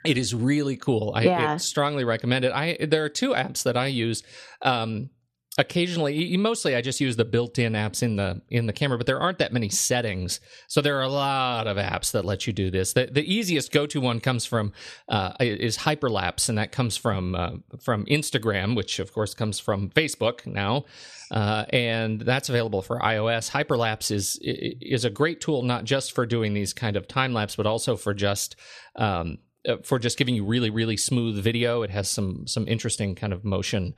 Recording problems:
none

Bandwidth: 13.5 kHz